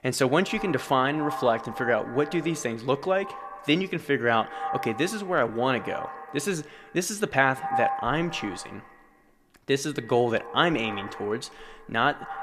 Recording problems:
echo of what is said; strong; throughout; 80 ms later, 10 dB below the speech

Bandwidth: 14.5 kHz